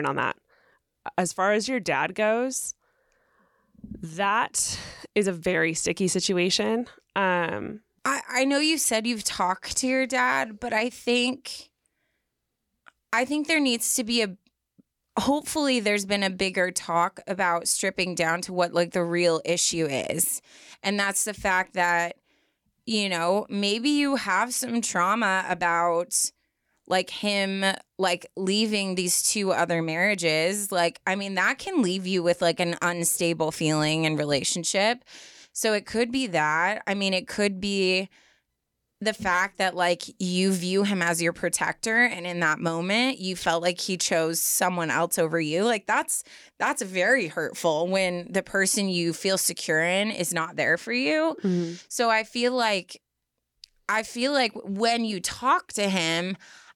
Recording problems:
abrupt cut into speech; at the start

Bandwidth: 18.5 kHz